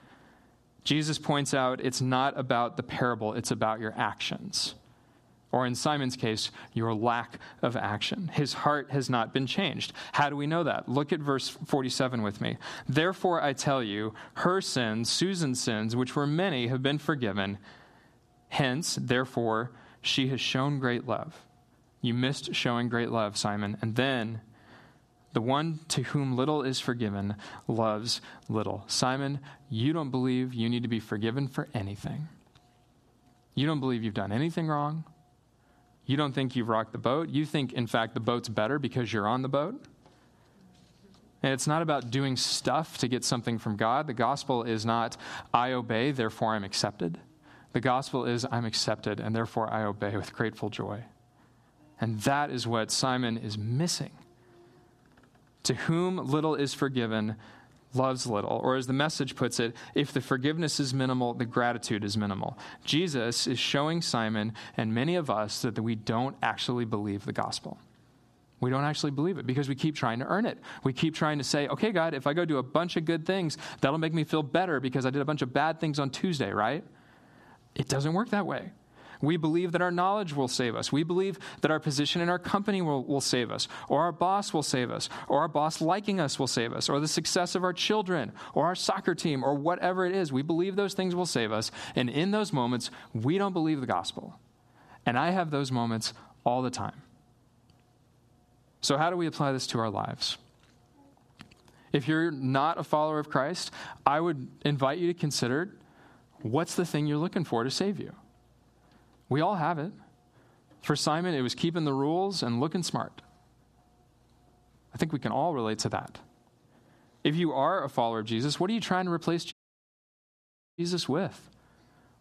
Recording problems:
squashed, flat; somewhat
audio cutting out; at 2:00 for 1.5 s

